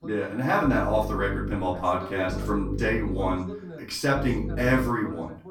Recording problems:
off-mic speech; far
room echo; slight; dies away in 0.4 s
electrical hum; noticeable; at 0.5 s, from 2.5 to 3.5 s and at 4 s; 50 Hz, 15 dB below the speech
voice in the background; noticeable; throughout; 15 dB below the speech

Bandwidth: 17.5 kHz